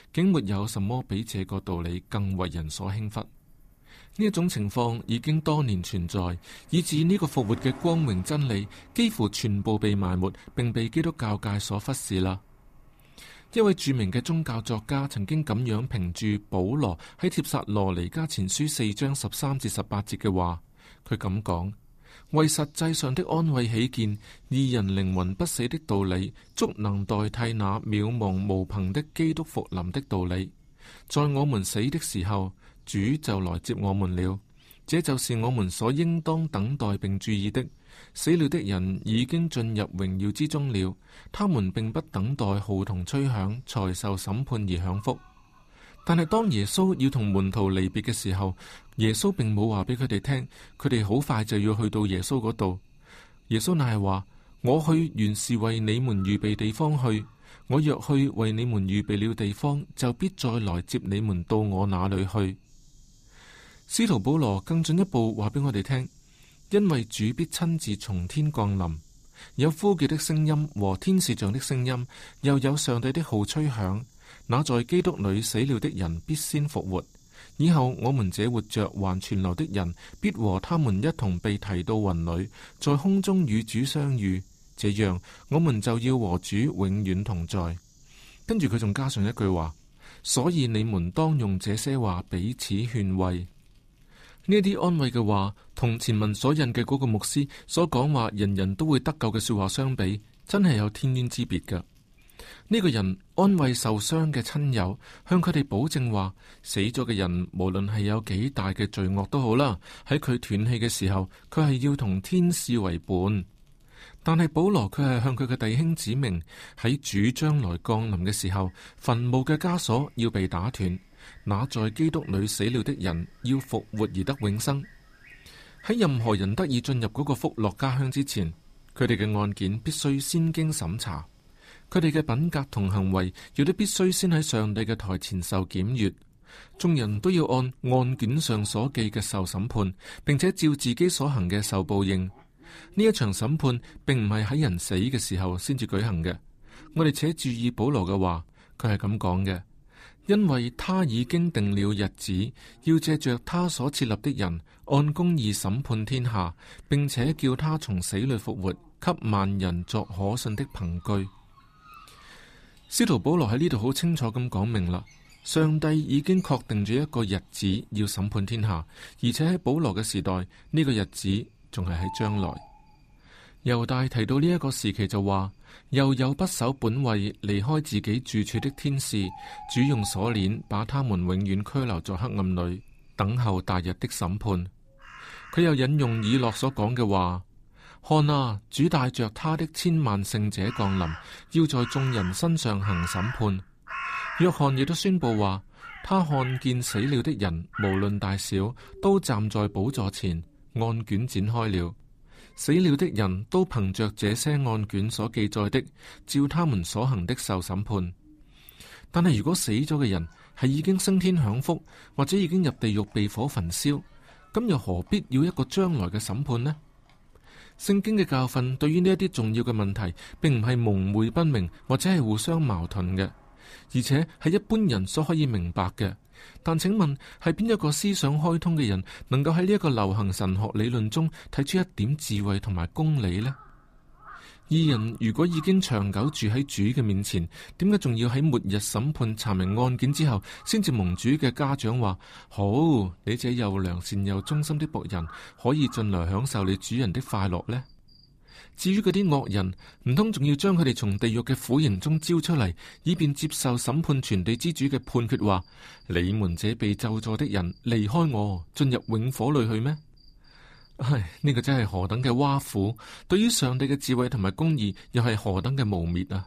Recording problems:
animal sounds; faint; throughout; 20 dB below the speech

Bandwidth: 14.5 kHz